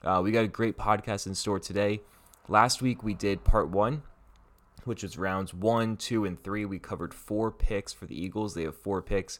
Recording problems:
none

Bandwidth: 17.5 kHz